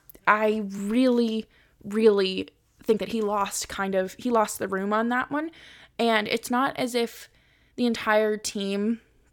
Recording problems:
uneven, jittery; strongly; from 1 to 8.5 s

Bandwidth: 17.5 kHz